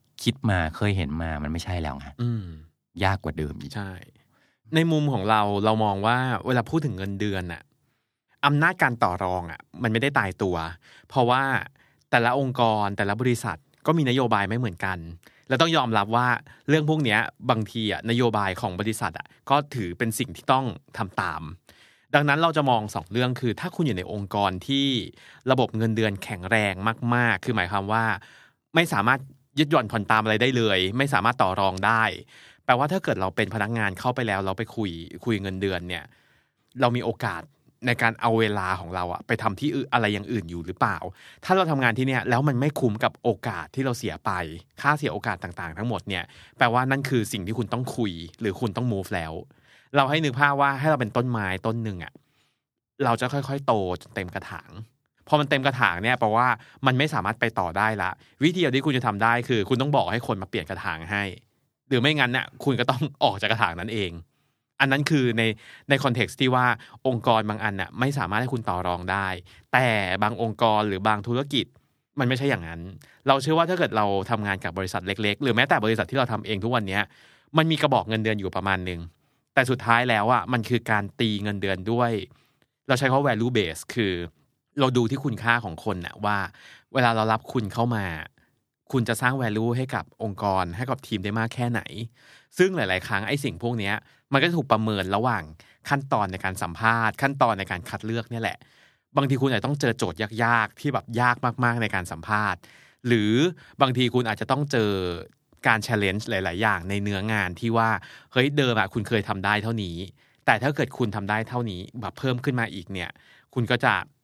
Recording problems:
none

